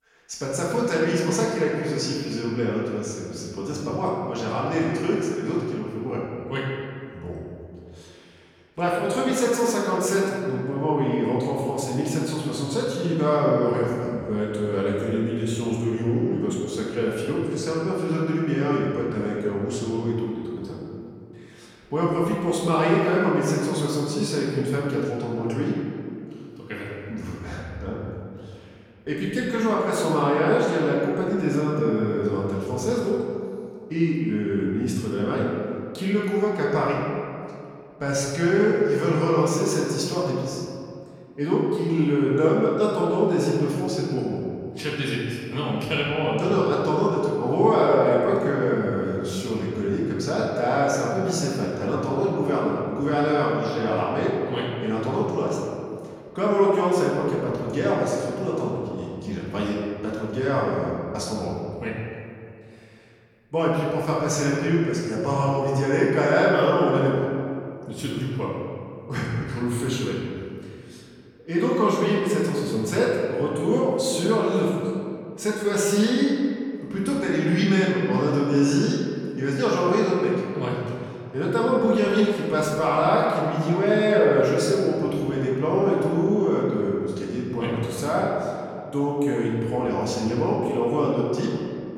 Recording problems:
off-mic speech; far
room echo; noticeable; dies away in 2.2 s

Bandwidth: 17 kHz